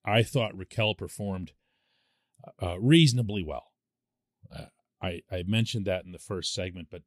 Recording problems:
none

